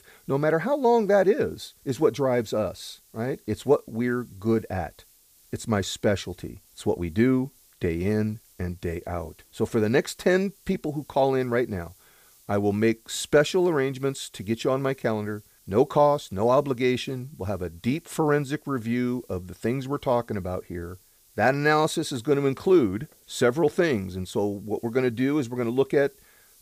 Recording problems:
hiss; faint; throughout; 30 dB below the speech

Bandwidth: 15 kHz